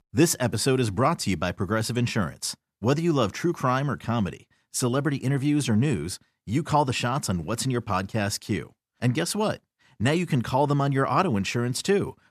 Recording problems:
none

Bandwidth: 14.5 kHz